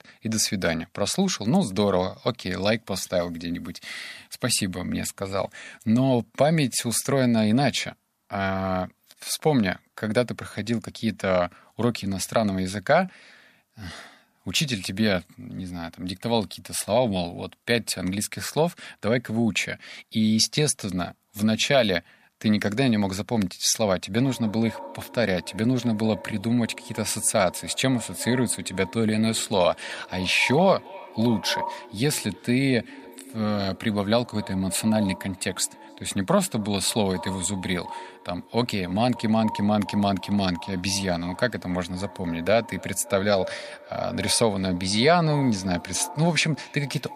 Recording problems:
echo of what is said; noticeable; from 24 s on; 280 ms later, 15 dB below the speech

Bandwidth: 14.5 kHz